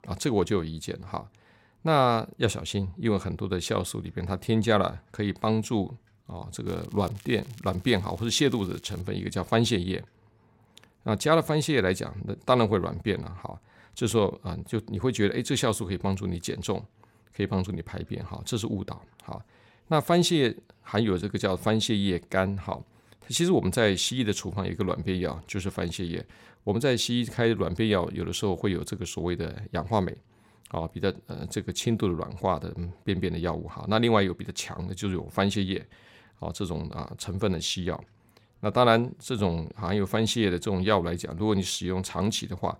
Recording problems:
crackling; faint; from 6.5 to 9 s; 25 dB below the speech

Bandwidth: 16 kHz